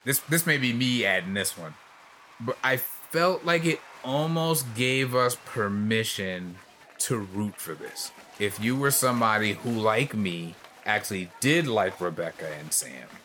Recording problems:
crowd noise; faint; throughout; 20 dB below the speech

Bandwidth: 18 kHz